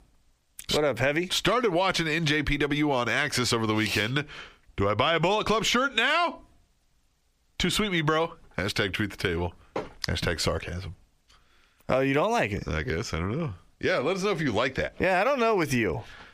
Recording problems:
squashed, flat; heavily

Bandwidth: 15 kHz